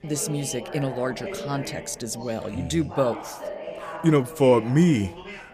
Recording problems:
background chatter; noticeable; throughout; 3 voices, 10 dB below the speech

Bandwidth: 14.5 kHz